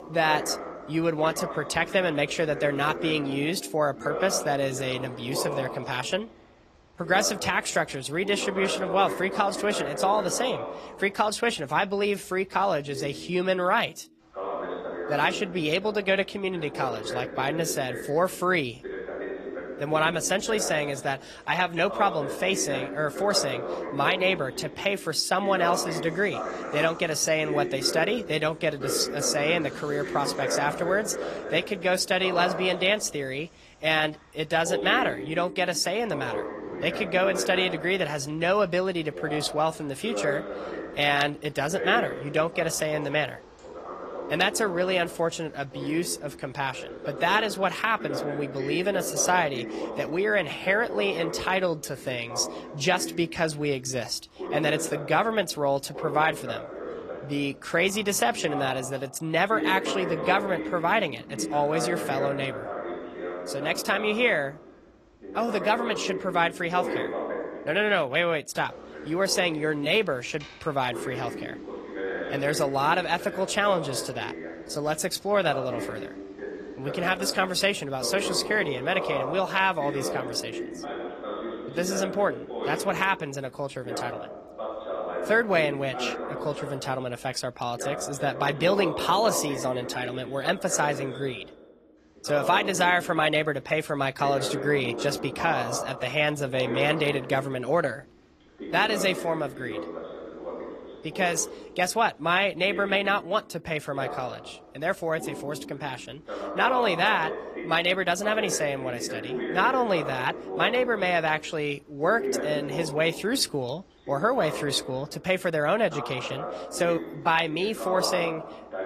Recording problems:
garbled, watery; slightly; nothing above 14.5 kHz
voice in the background; loud; throughout; 9 dB below the speech

